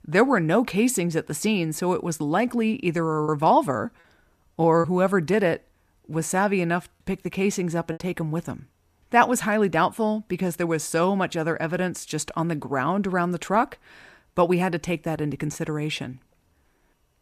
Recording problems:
choppy; very; from 3 to 8 s; 5% of the speech affected

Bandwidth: 14.5 kHz